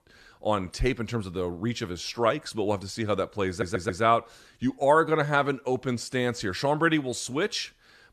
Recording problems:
audio stuttering; at 3.5 s

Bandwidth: 13.5 kHz